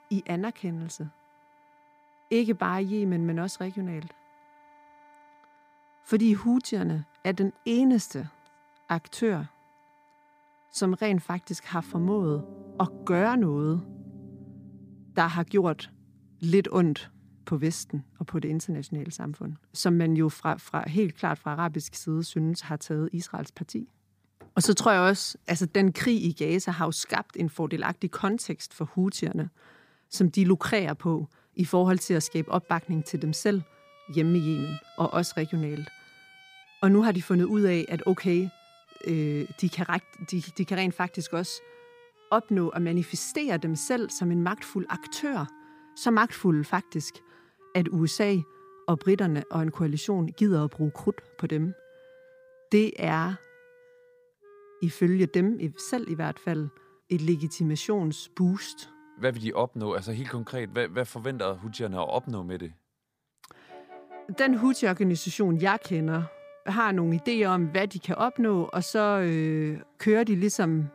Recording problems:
background music; faint; throughout; 25 dB below the speech

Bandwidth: 15 kHz